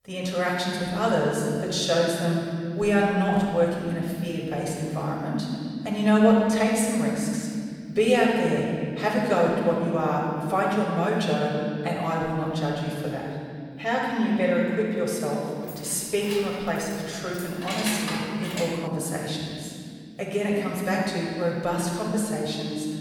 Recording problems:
room echo; strong; dies away in 2.3 s
off-mic speech; far
jangling keys; noticeable; from 16 to 19 s; peak 3 dB below the speech

